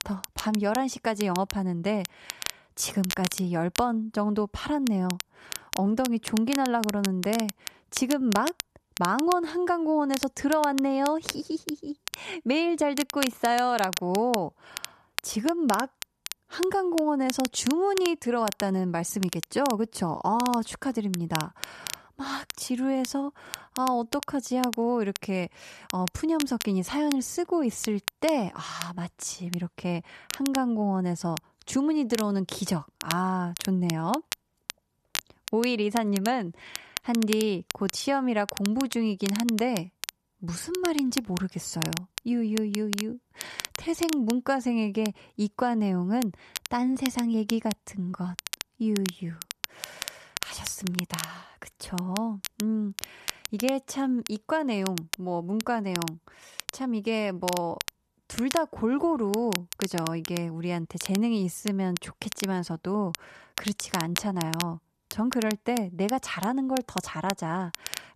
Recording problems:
crackle, like an old record; loud; 8 dB below the speech

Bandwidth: 13.5 kHz